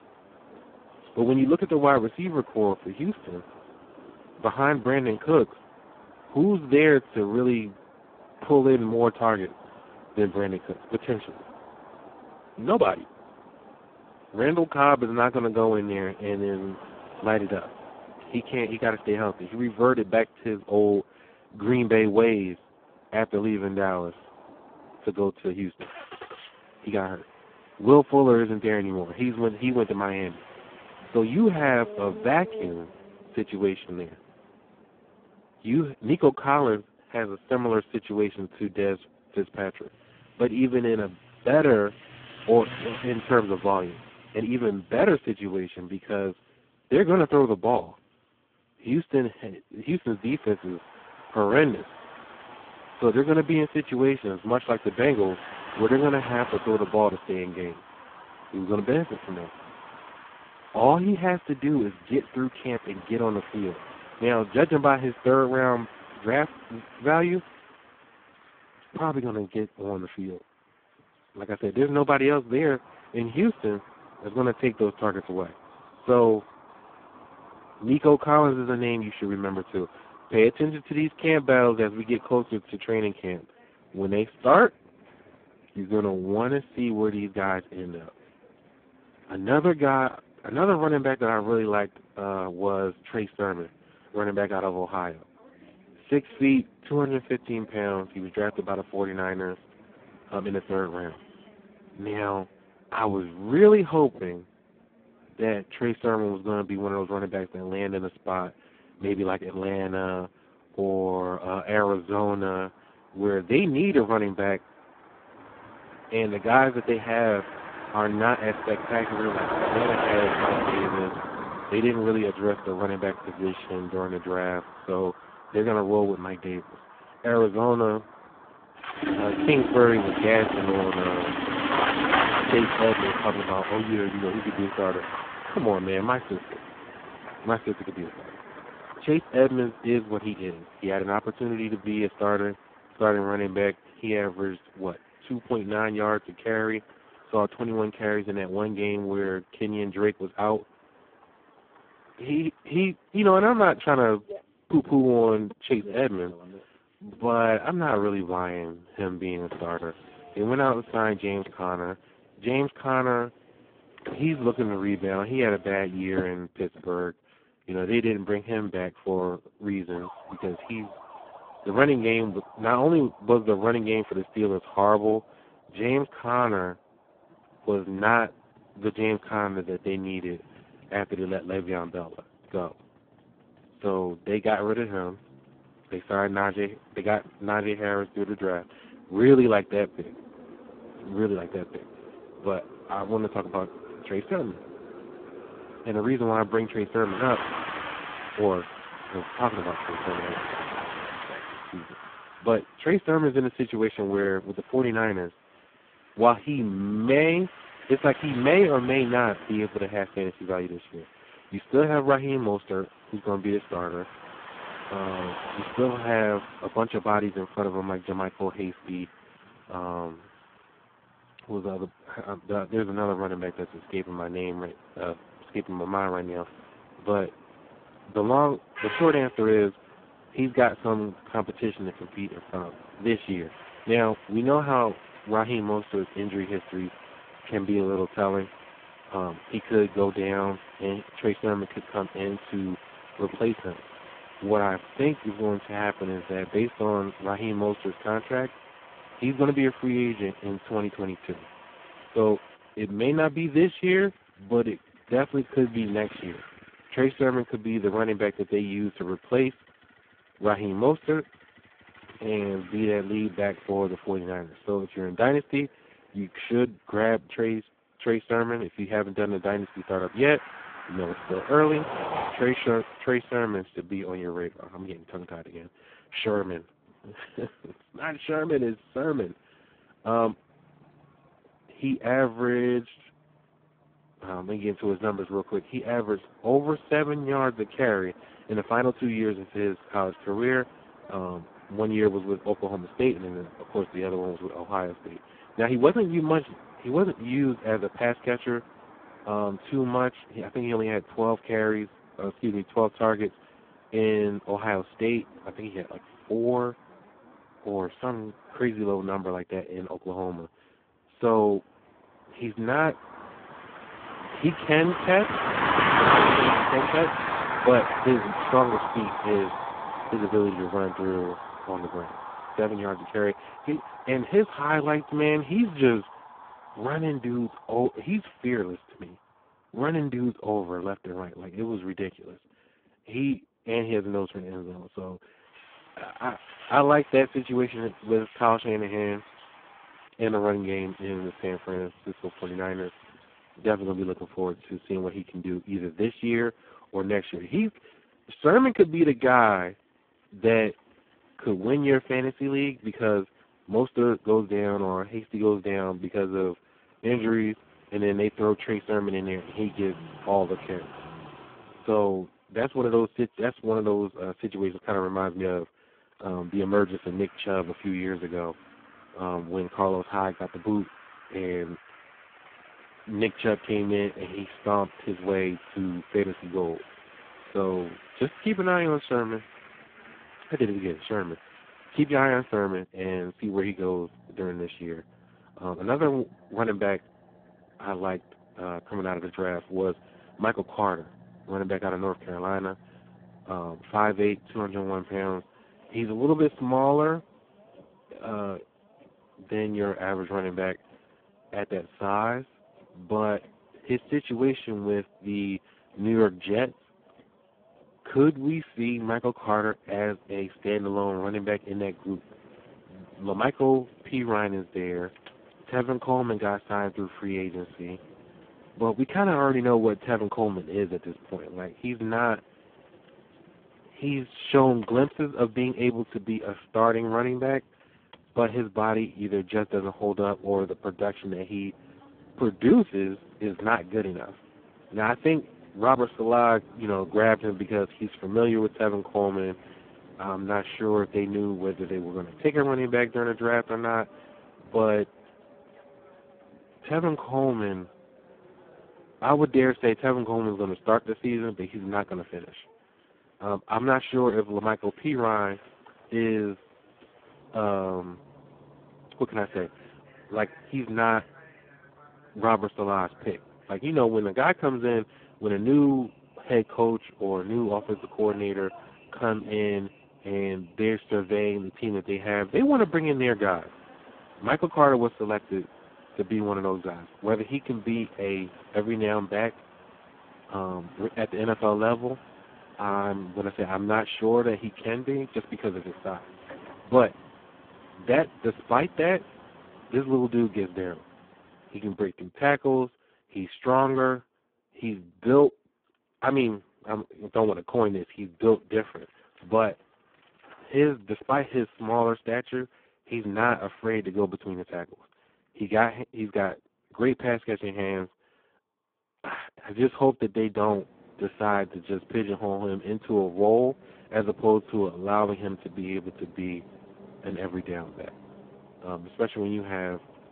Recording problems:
phone-call audio; poor line
traffic noise; loud; throughout; 9 dB below the speech

